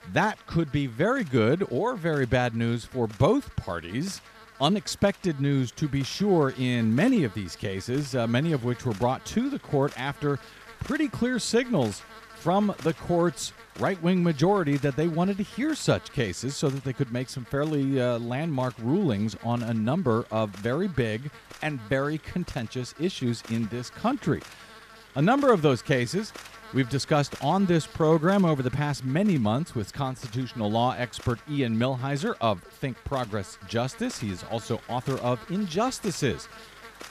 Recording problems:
electrical hum; noticeable; throughout; 50 Hz, 15 dB below the speech

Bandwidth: 14.5 kHz